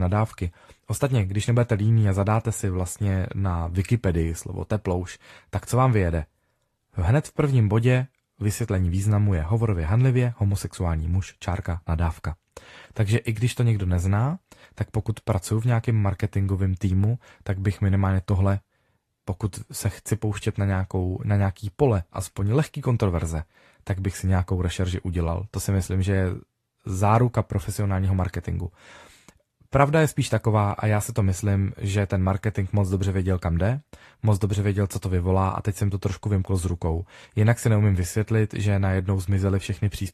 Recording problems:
garbled, watery; slightly; nothing above 13.5 kHz
abrupt cut into speech; at the start

